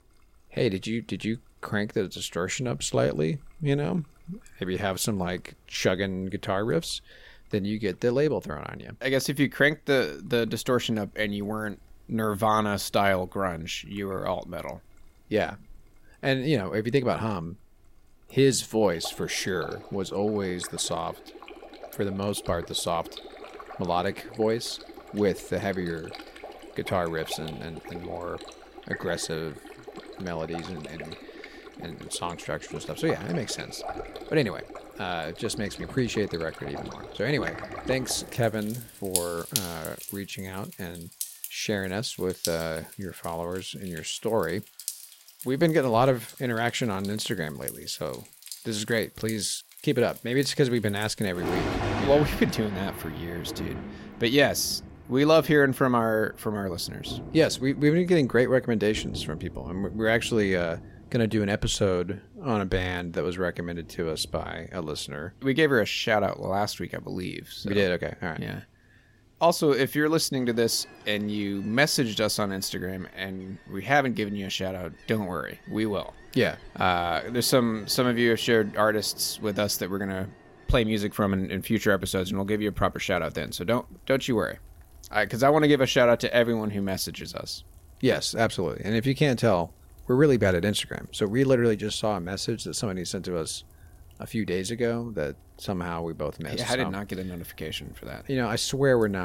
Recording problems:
rain or running water; noticeable; throughout; 15 dB below the speech
abrupt cut into speech; at the end

